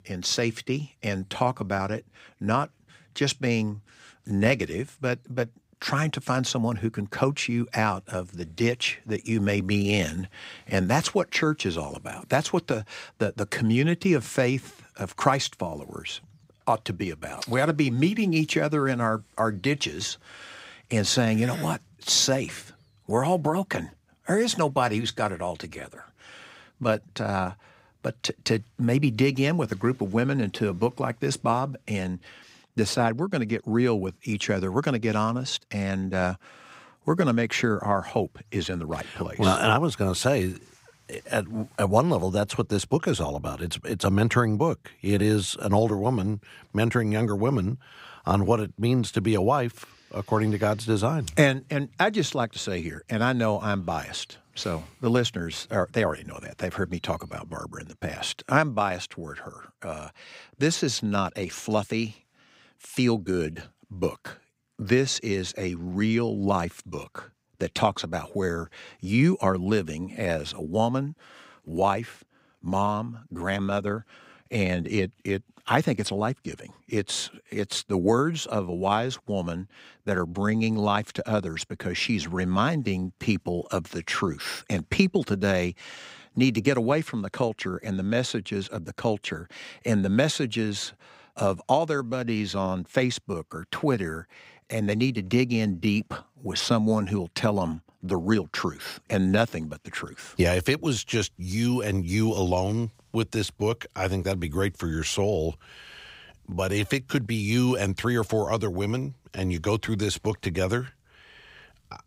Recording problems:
none

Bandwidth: 15.5 kHz